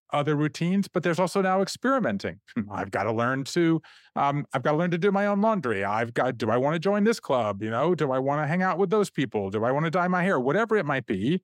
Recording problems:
none

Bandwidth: 16 kHz